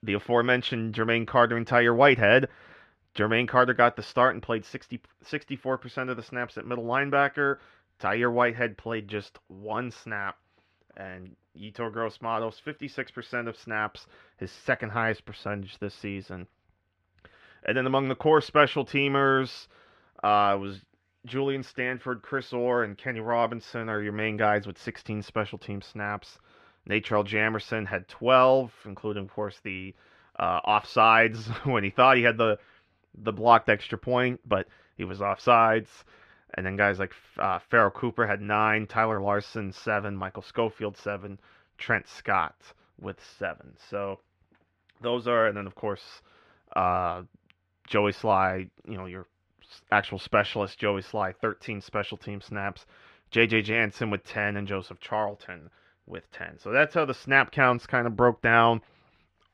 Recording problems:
muffled; slightly; fading above 2.5 kHz

